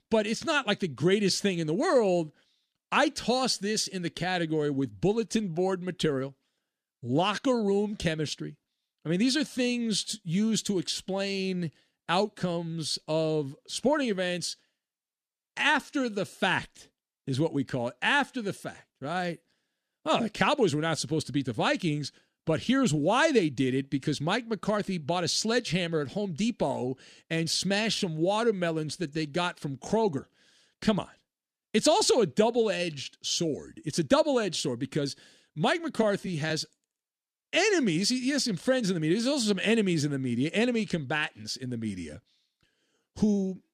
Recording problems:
none

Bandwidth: 13.5 kHz